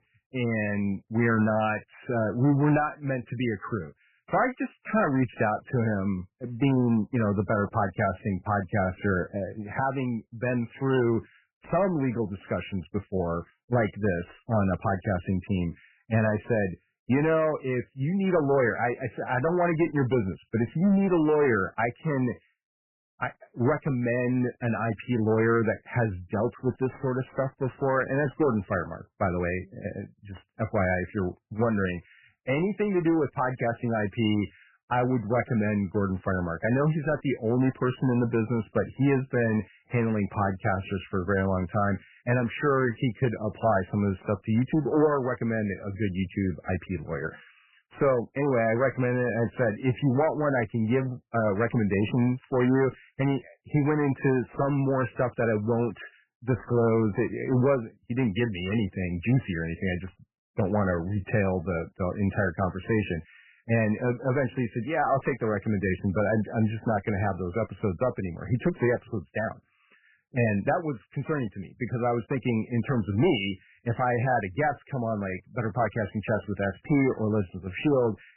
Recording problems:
garbled, watery; badly; nothing above 3 kHz
distortion; slight; 4% of the sound clipped

